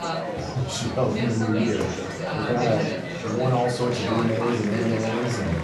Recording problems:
room echo; slight; dies away in 0.4 s
off-mic speech; somewhat distant
chatter from many people; loud; throughout; 4 dB below the speech
crowd noise; noticeable; throughout; 15 dB below the speech
background music; faint; throughout; 25 dB below the speech
clattering dishes; faint; at 2 s; peak 15 dB below the speech

